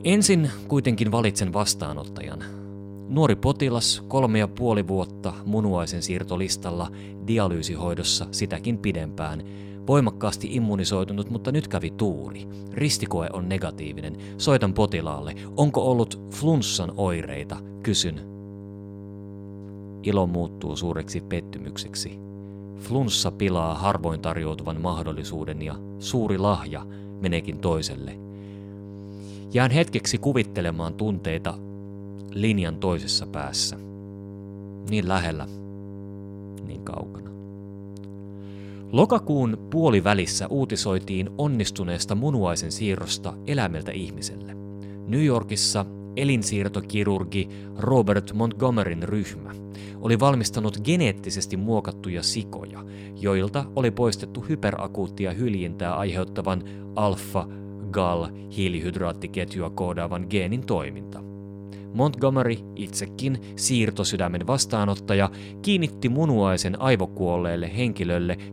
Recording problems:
electrical hum; noticeable; throughout; 50 Hz, 20 dB below the speech

